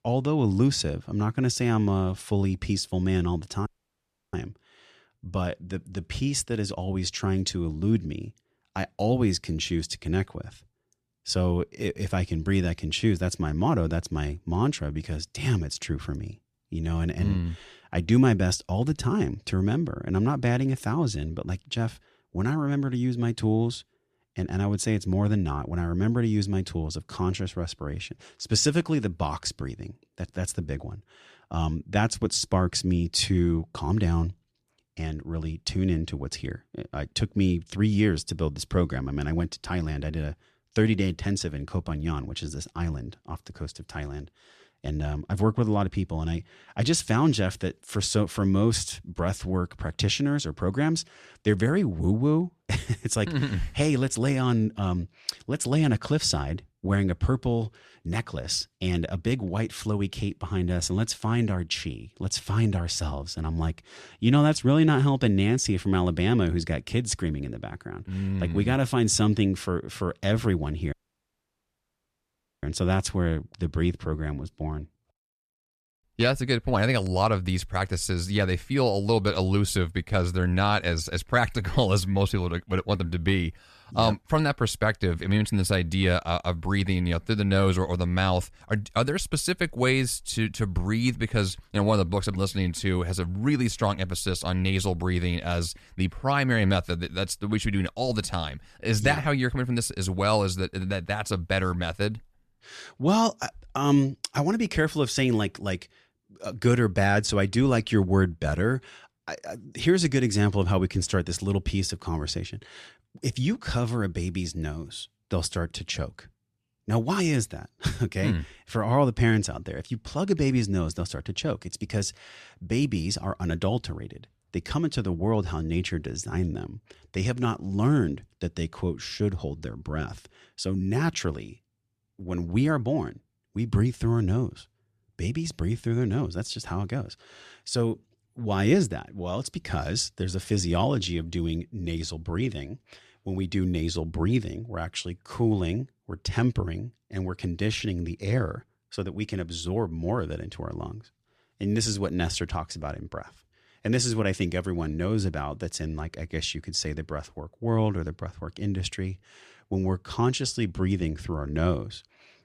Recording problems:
audio cutting out; at 3.5 s for 0.5 s and at 1:11 for 1.5 s

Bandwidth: 14 kHz